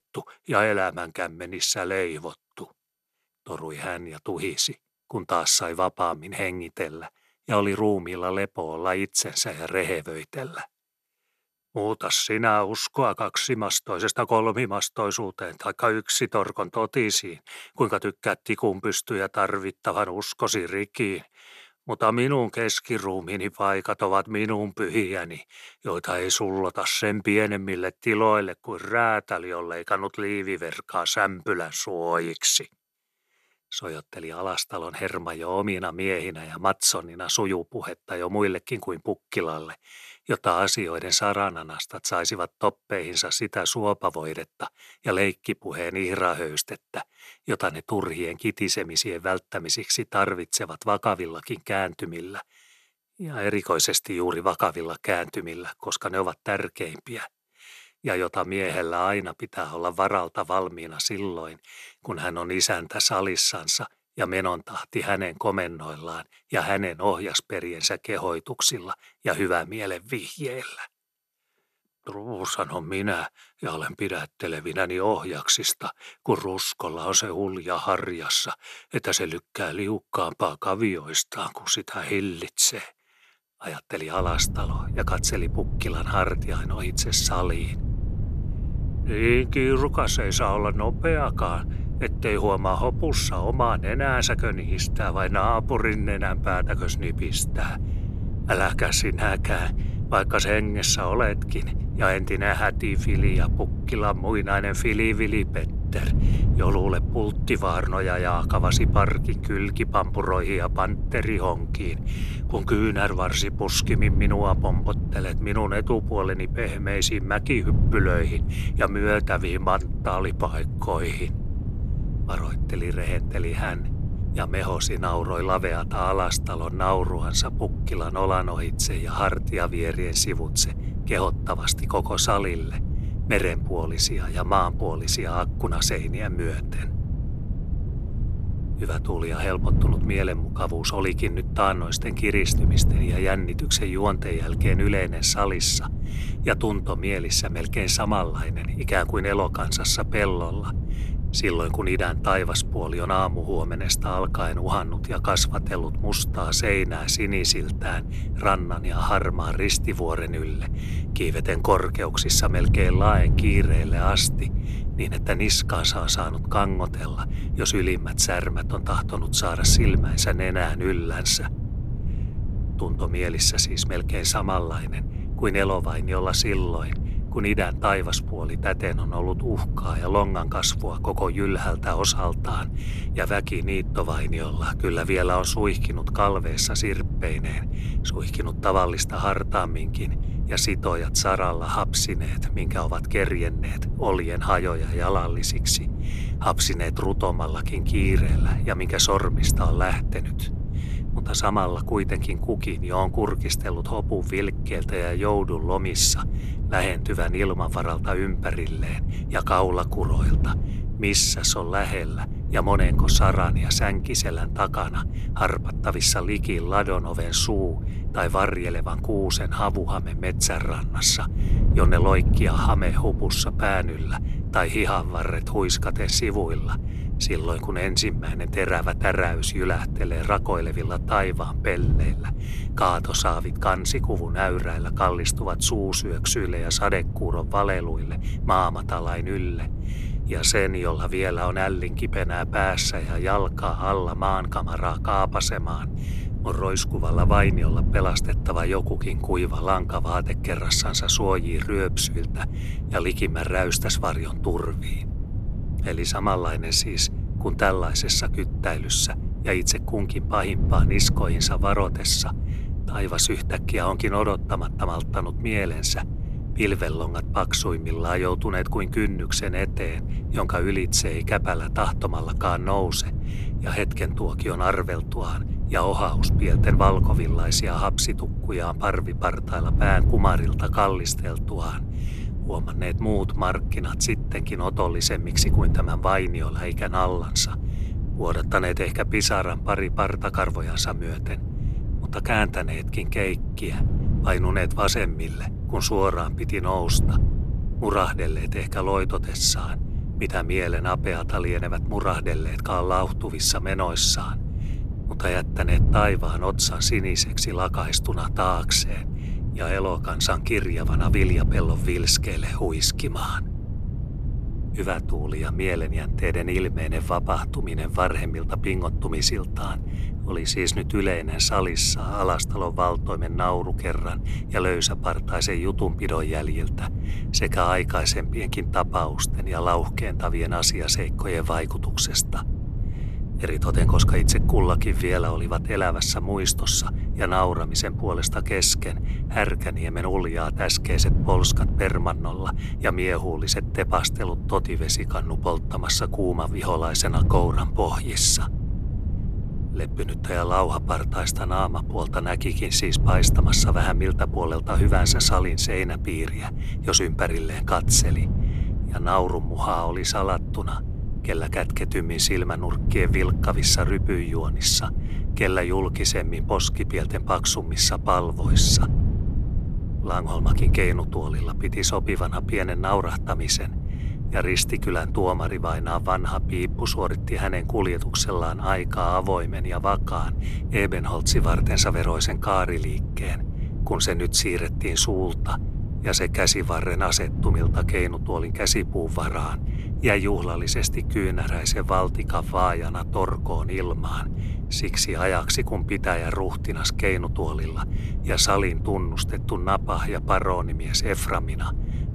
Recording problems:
wind noise on the microphone; occasional gusts; from 1:24 on; 15 dB below the speech

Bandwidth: 13.5 kHz